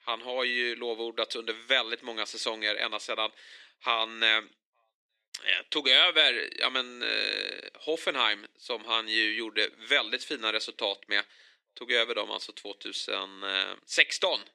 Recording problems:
thin; very; fading below 450 Hz

